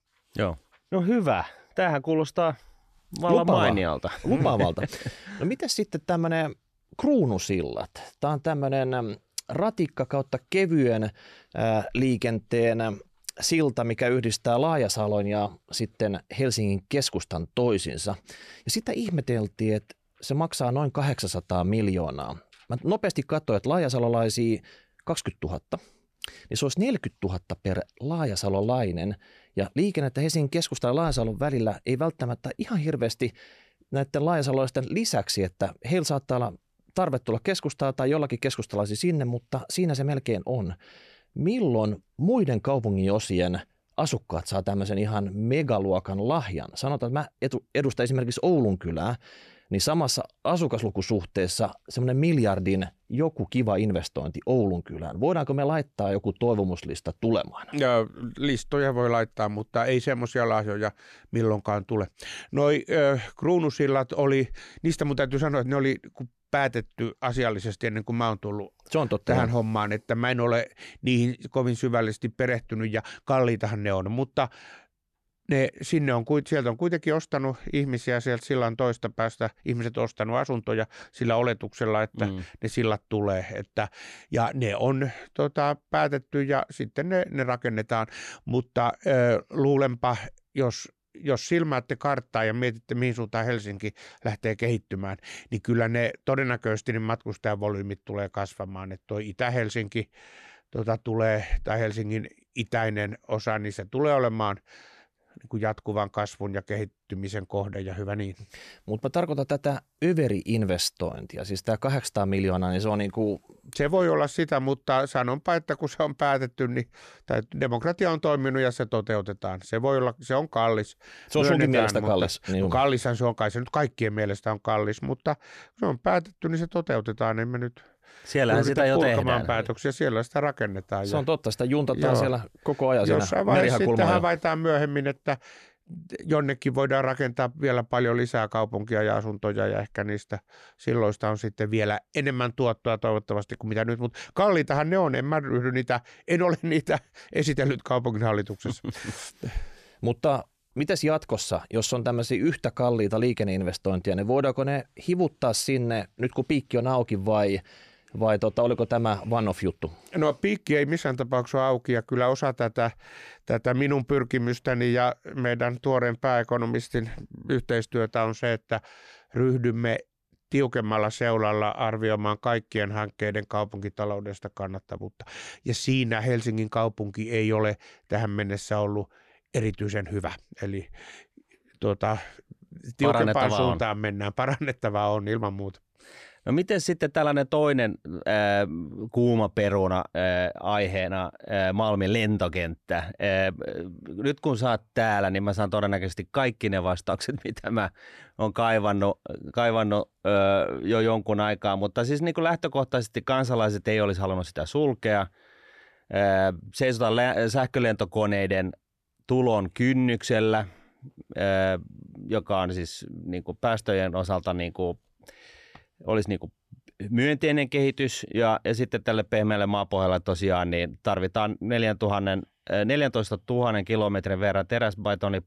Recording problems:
none

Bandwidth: 14.5 kHz